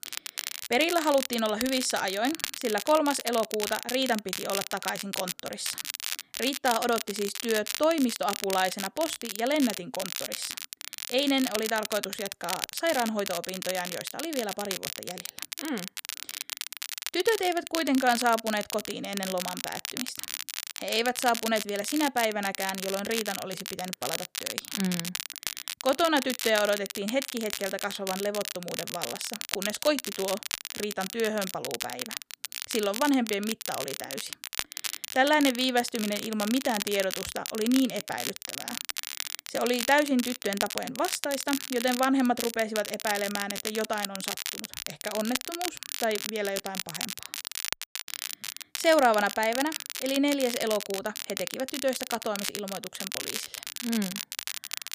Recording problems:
crackle, like an old record; loud; 5 dB below the speech

